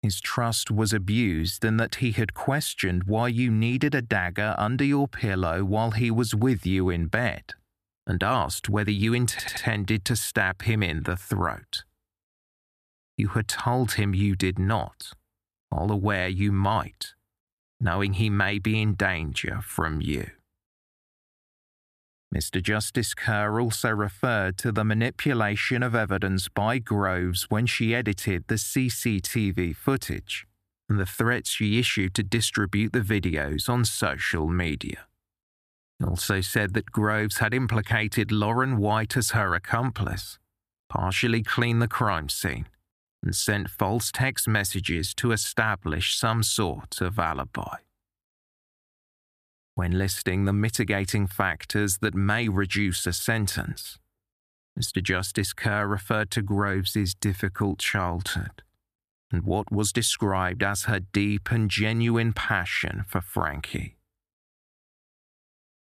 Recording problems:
audio stuttering; at 9.5 s

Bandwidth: 14.5 kHz